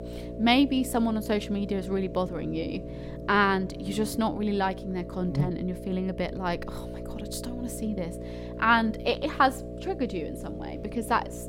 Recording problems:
electrical hum; noticeable; throughout; 60 Hz, 15 dB below the speech

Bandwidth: 16 kHz